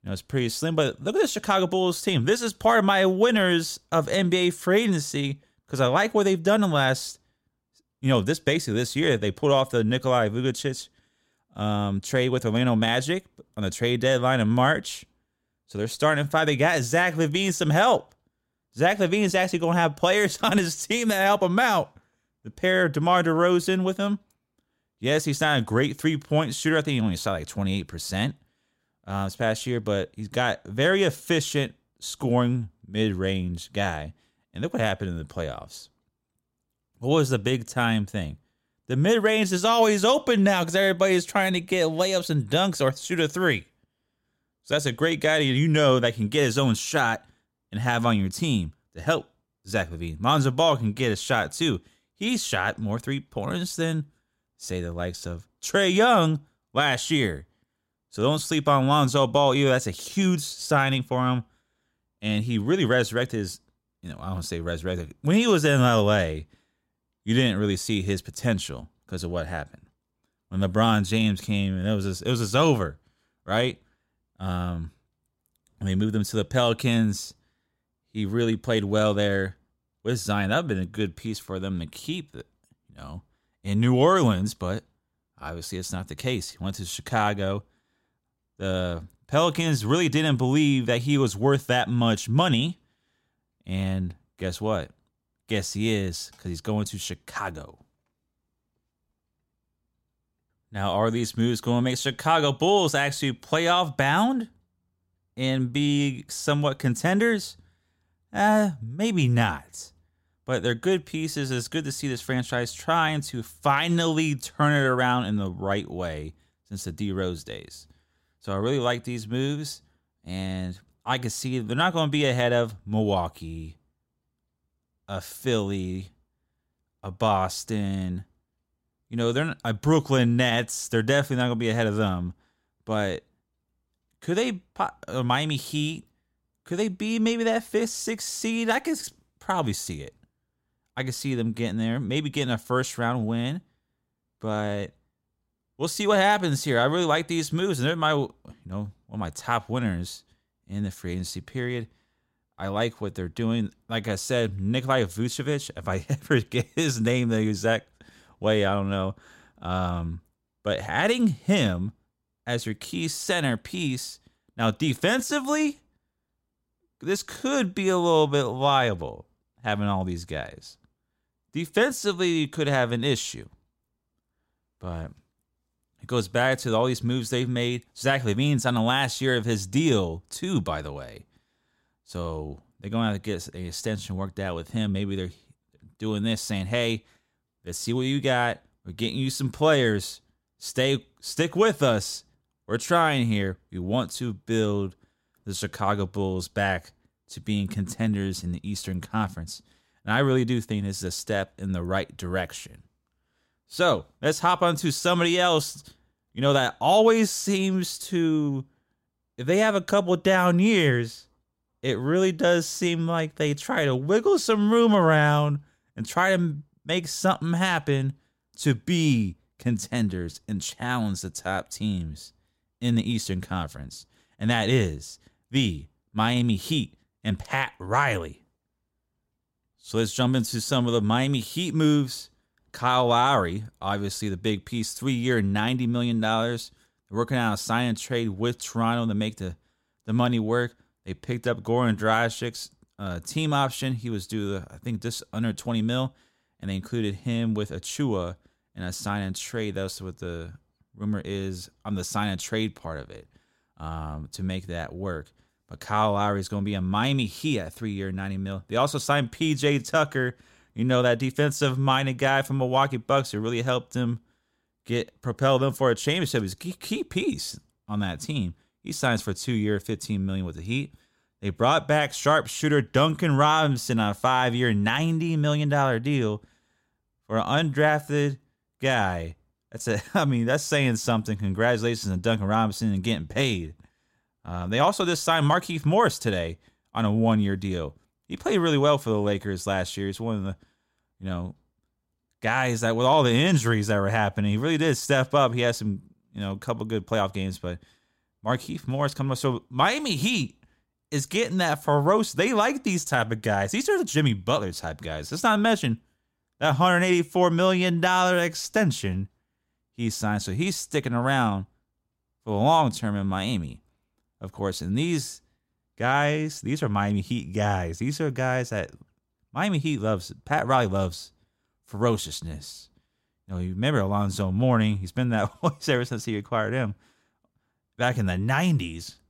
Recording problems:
none

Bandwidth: 16 kHz